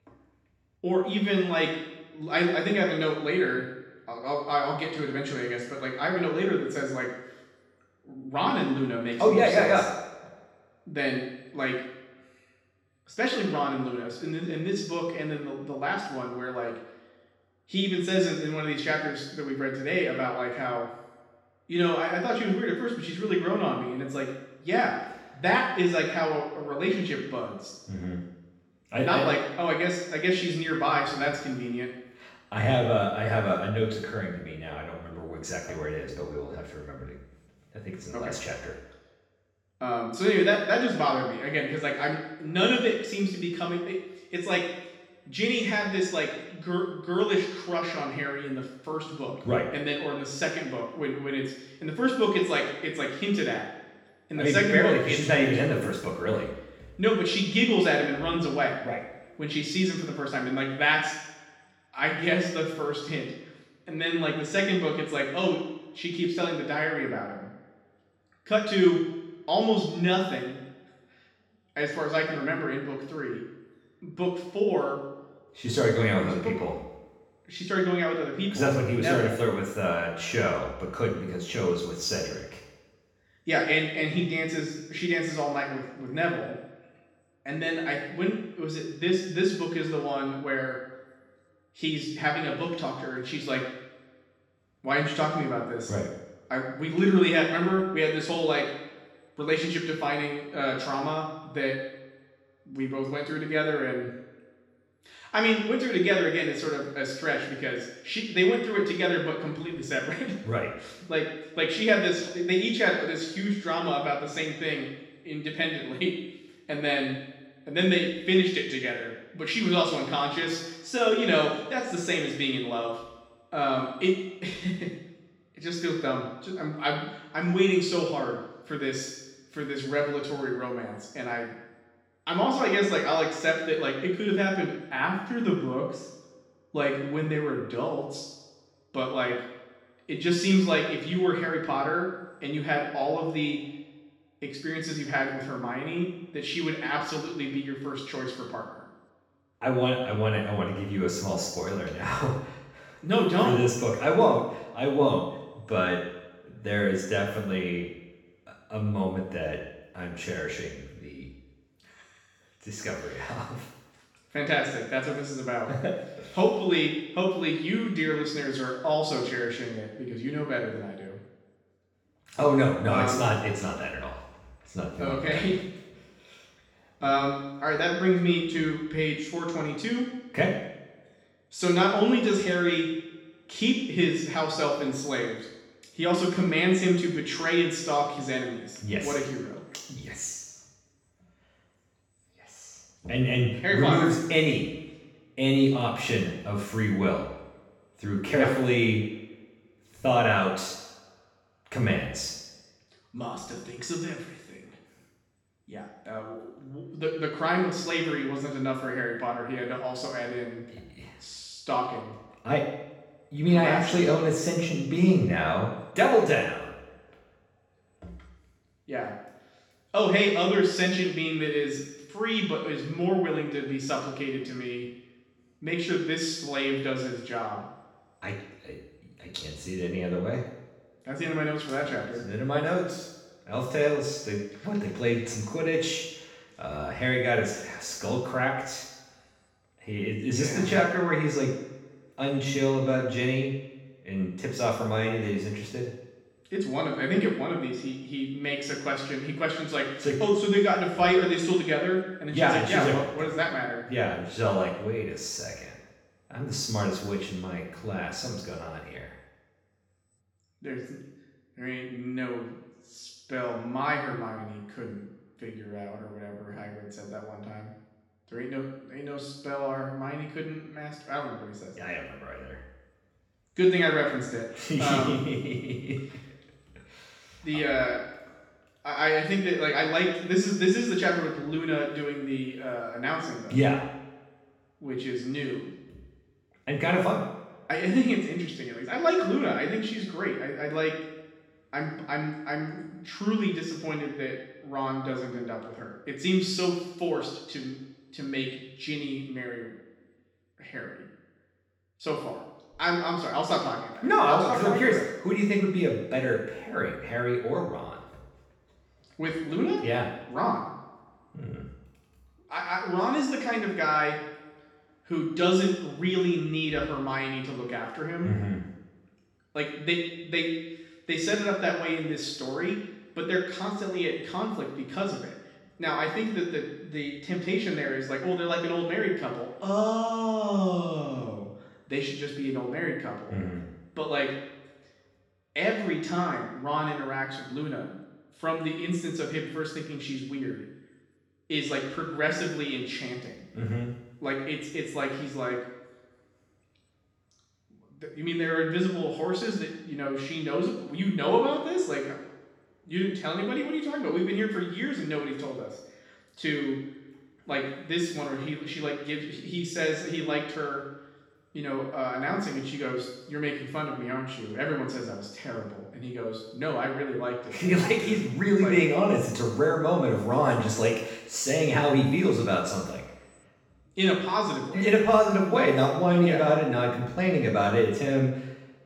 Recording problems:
off-mic speech; far
room echo; noticeable; dies away in 0.9 s

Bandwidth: 17.5 kHz